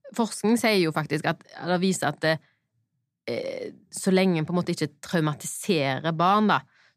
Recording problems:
none

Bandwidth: 14.5 kHz